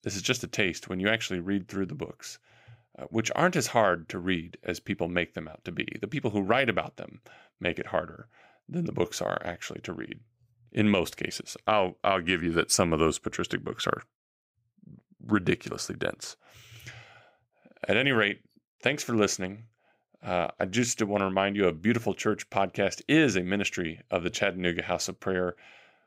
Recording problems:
none

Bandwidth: 15.5 kHz